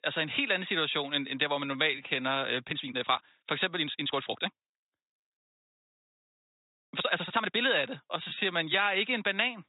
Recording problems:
high frequencies cut off; severe; nothing above 4 kHz
thin; somewhat; fading below 1 kHz
uneven, jittery; strongly; from 1.5 to 9 s

